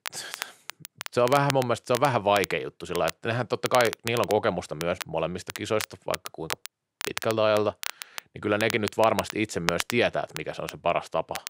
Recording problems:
crackle, like an old record; loud; 10 dB below the speech

